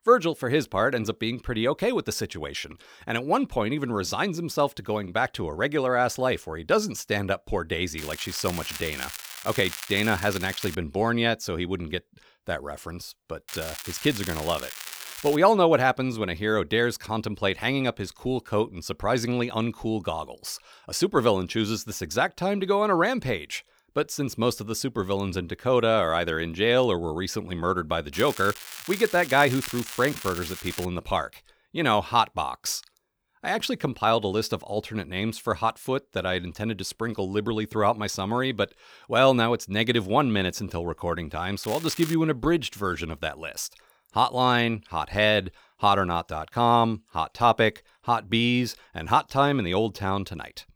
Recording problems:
crackling; noticeable; 4 times, first at 8 s; 10 dB below the speech

